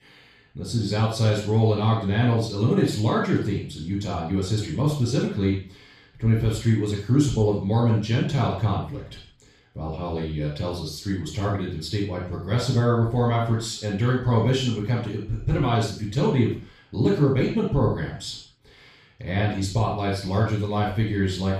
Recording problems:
off-mic speech; far
room echo; noticeable; dies away in 0.4 s

